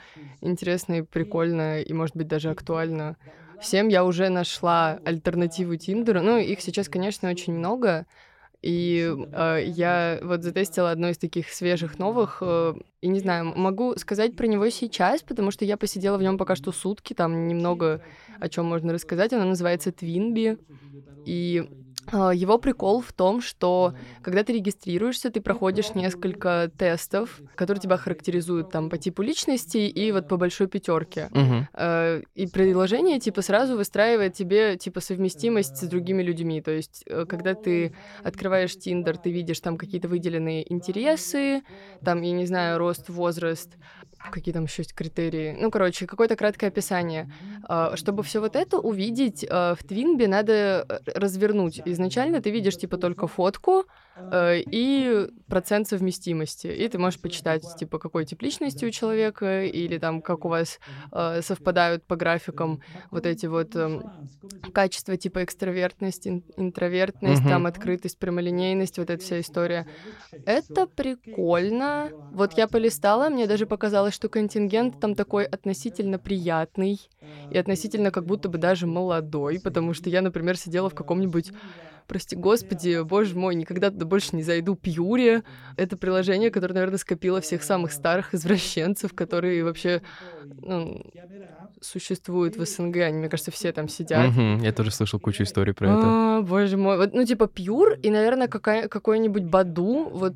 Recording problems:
voice in the background; faint; throughout; 20 dB below the speech

